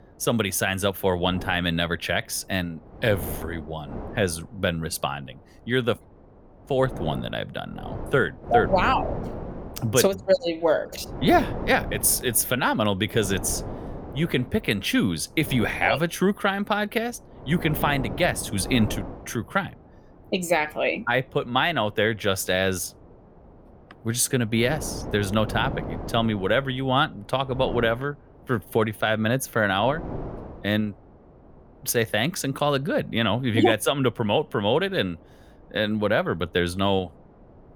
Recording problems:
wind noise on the microphone; occasional gusts; 15 dB below the speech

